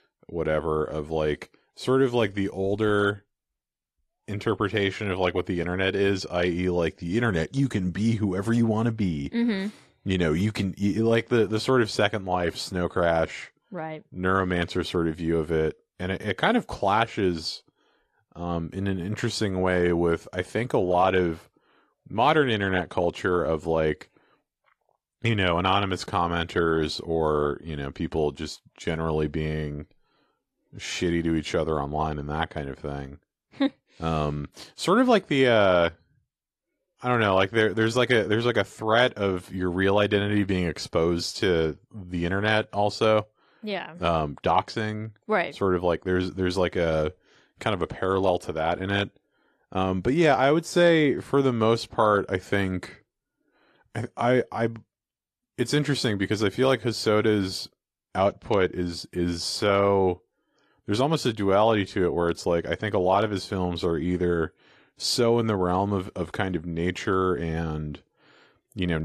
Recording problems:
garbled, watery; slightly; nothing above 13.5 kHz
abrupt cut into speech; at the end

